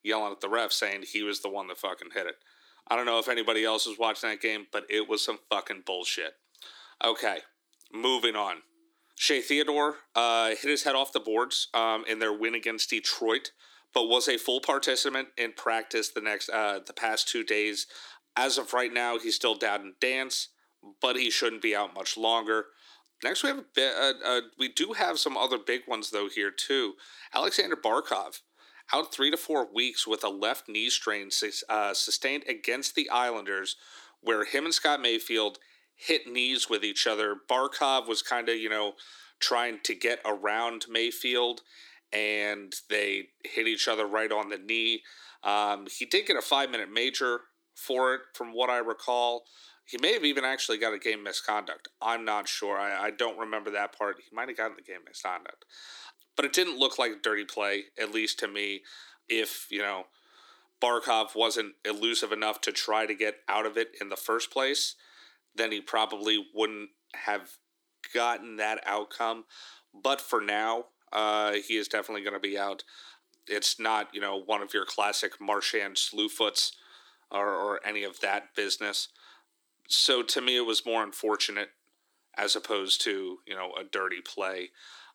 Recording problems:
thin; somewhat; fading below 300 Hz

